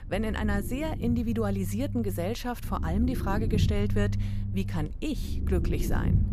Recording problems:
low rumble; loud; throughout; 9 dB below the speech

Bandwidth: 14.5 kHz